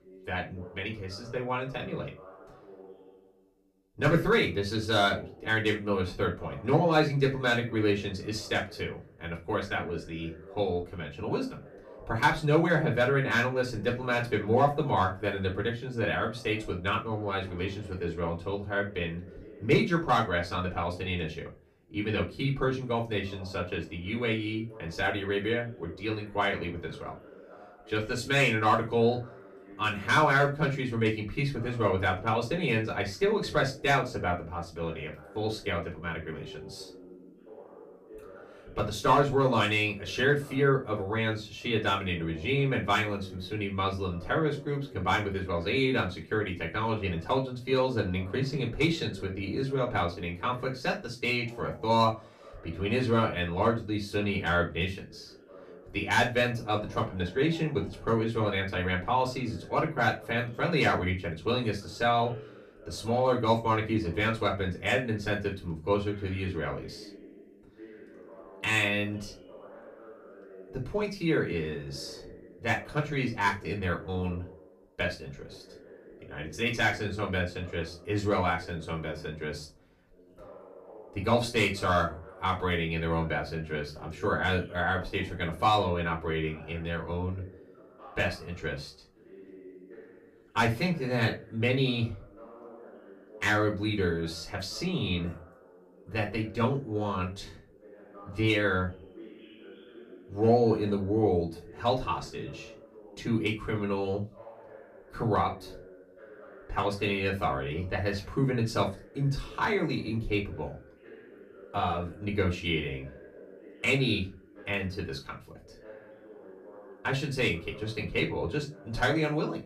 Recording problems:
off-mic speech; far
room echo; very slight; dies away in 0.2 s
voice in the background; faint; throughout; 20 dB below the speech

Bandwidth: 15 kHz